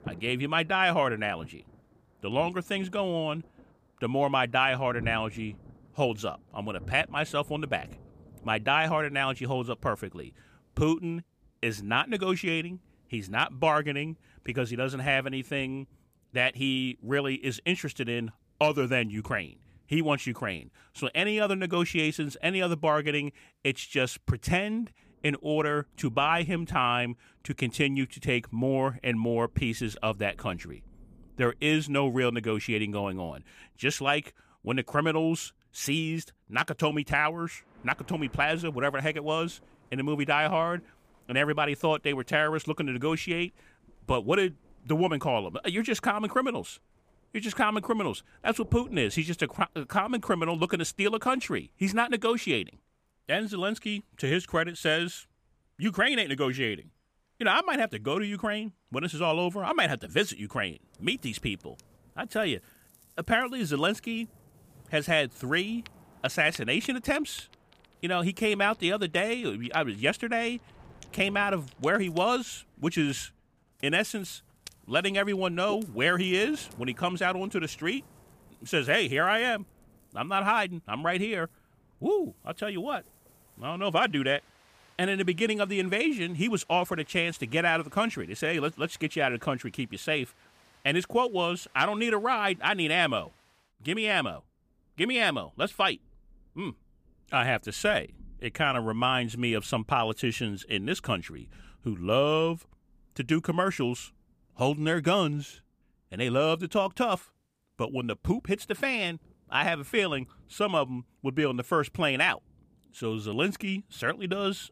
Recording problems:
rain or running water; faint; throughout; 25 dB below the speech

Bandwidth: 15 kHz